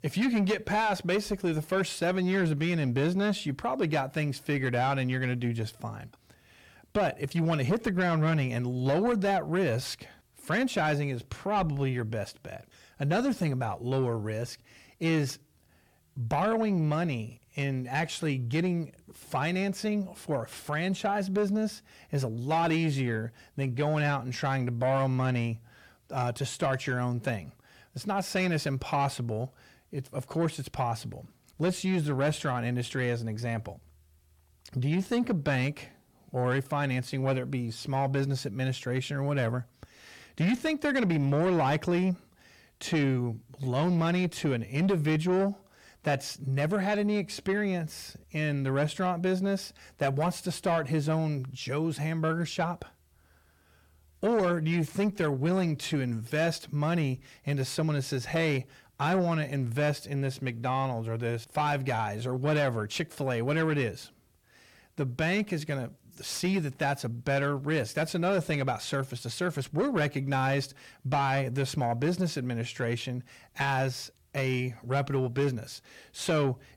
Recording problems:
distortion; slight; 10 dB below the speech

